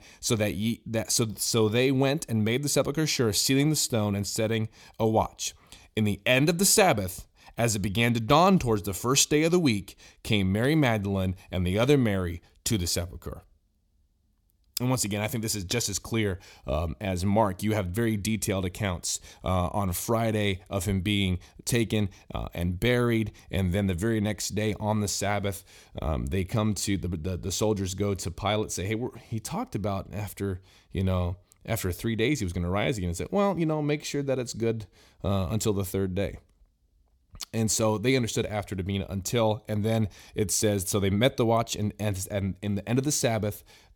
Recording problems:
none

